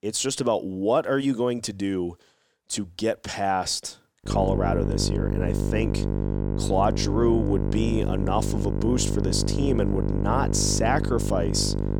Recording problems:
electrical hum; loud; from 4.5 s on; 50 Hz, 6 dB below the speech

